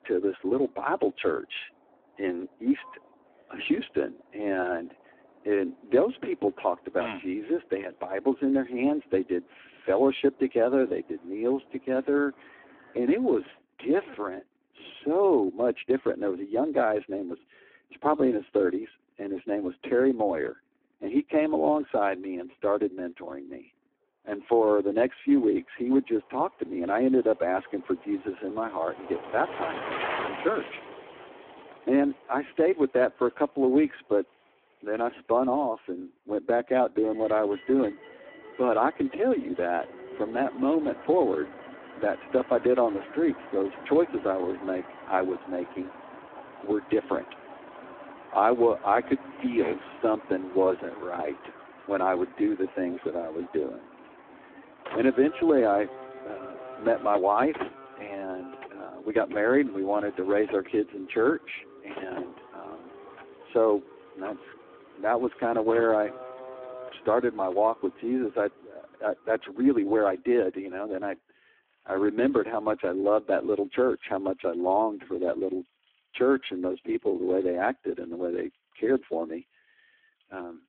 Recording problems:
phone-call audio; poor line
traffic noise; noticeable; throughout; 15 dB below the speech

